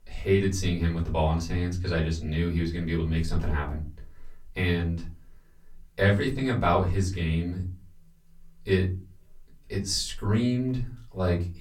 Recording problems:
off-mic speech; far
room echo; very slight; dies away in 0.3 s

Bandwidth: 17.5 kHz